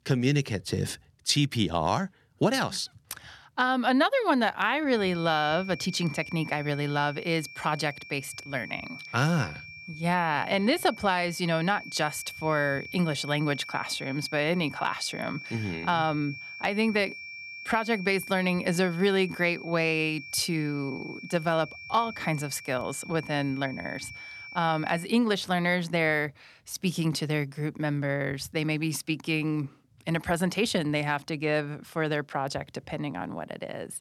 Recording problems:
high-pitched whine; noticeable; from 5 to 25 s; 2.5 kHz, 15 dB below the speech

